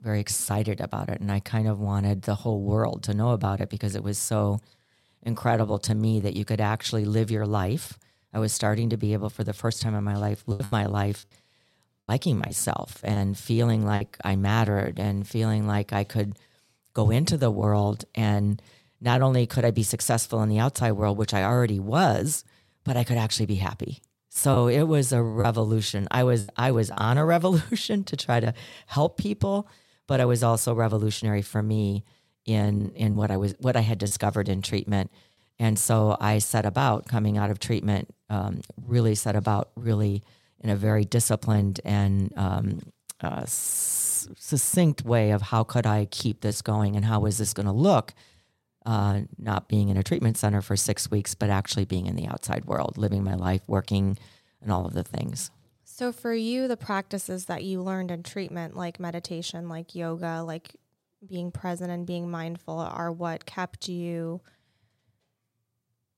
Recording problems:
choppy; very; from 11 to 14 s and from 25 to 27 s; 6% of the speech affected

